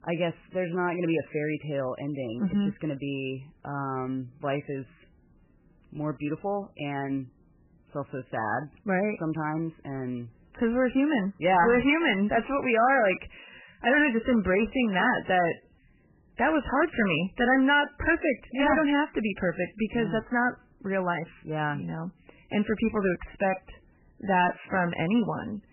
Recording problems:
garbled, watery; badly; nothing above 3 kHz
distortion; slight; 3% of the sound clipped

